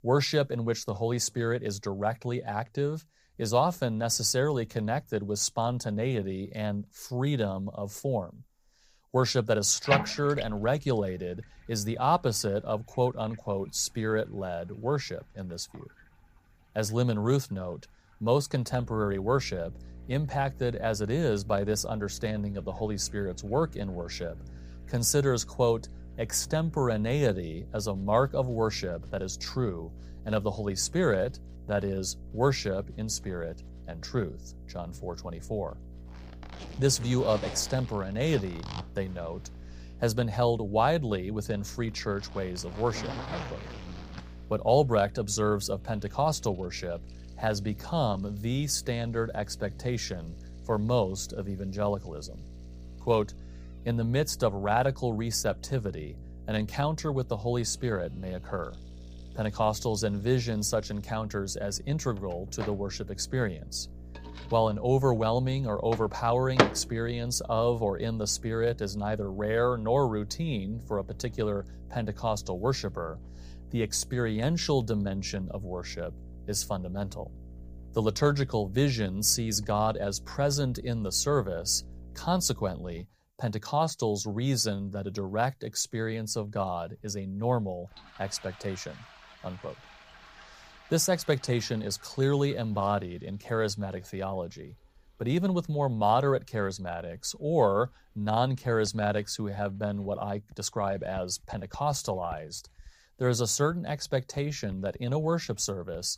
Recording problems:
household noises; loud; throughout; 9 dB below the speech
electrical hum; faint; from 19 s to 1:23; 60 Hz, 25 dB below the speech

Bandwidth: 15 kHz